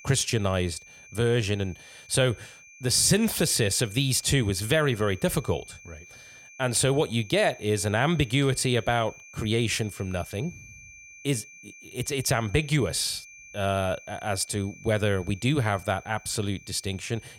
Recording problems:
high-pitched whine; faint; throughout; 2.5 kHz, 20 dB below the speech

